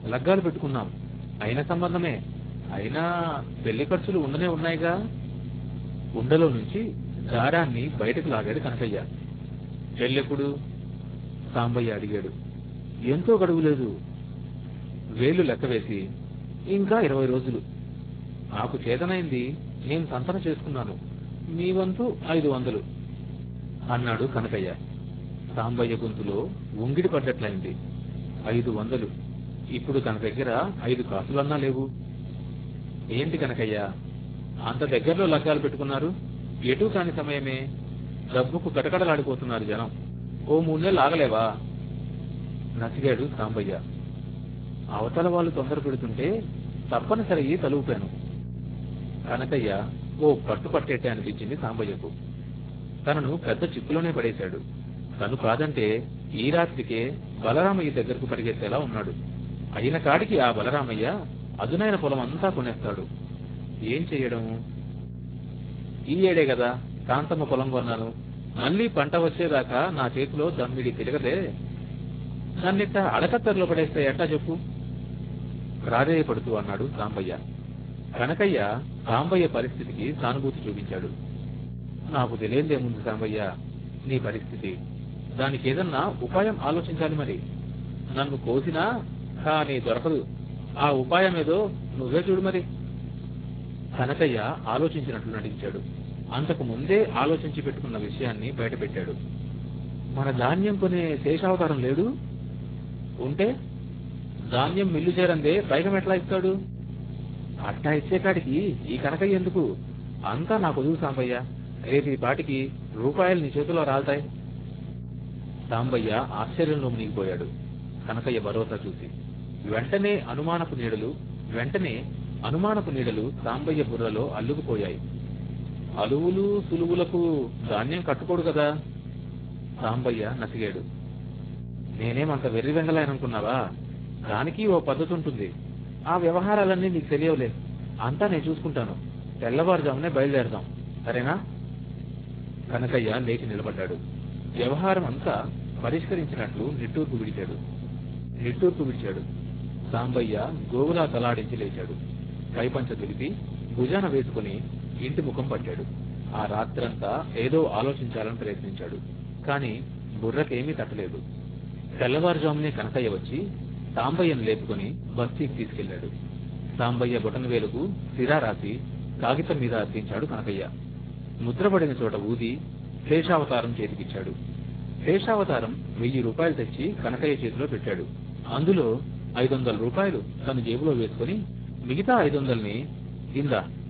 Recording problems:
garbled, watery; badly; nothing above 4 kHz
electrical hum; noticeable; throughout; 60 Hz, 15 dB below the speech

